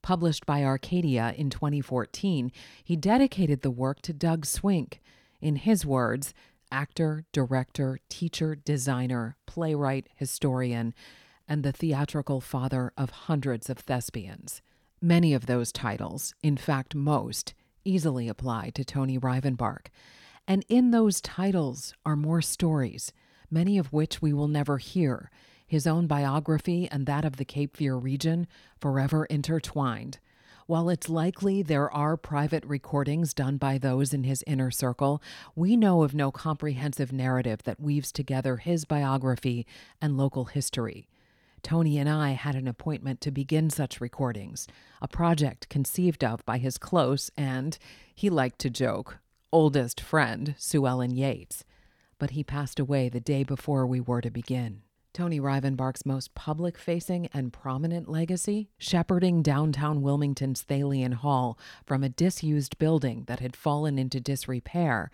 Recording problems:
none

